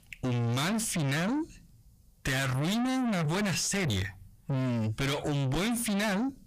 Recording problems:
distortion; heavy; 6 dB below the speech

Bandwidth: 15 kHz